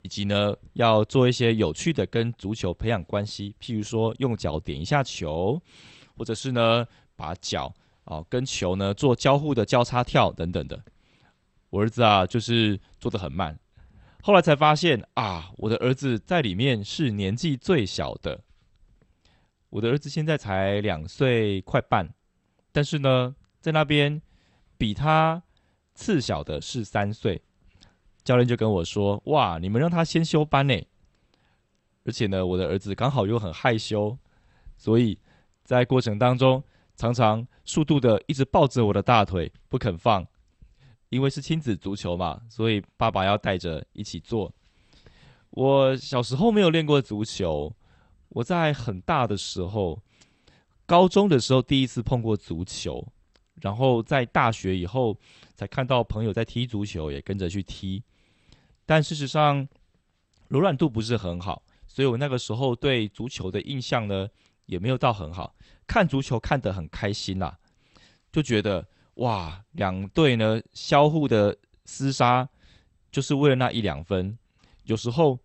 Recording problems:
garbled, watery; slightly; nothing above 8 kHz

